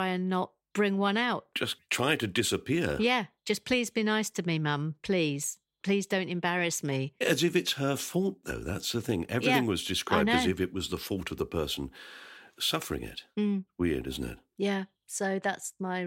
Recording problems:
abrupt cut into speech; at the start and the end

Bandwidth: 16 kHz